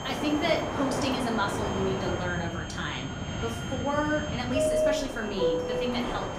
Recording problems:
room echo; slight; dies away in 0.5 s
off-mic speech; somewhat distant
train or aircraft noise; loud; throughout; as loud as the speech
high-pitched whine; noticeable; throughout; 3 kHz, 15 dB below the speech

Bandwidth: 15.5 kHz